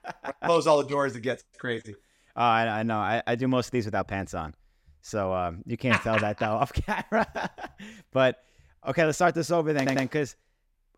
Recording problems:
audio stuttering; at 10 s

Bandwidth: 16 kHz